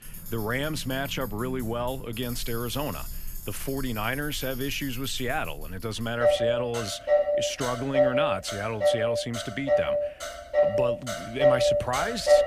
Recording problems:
traffic noise; very loud; throughout; 4 dB above the speech

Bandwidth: 14.5 kHz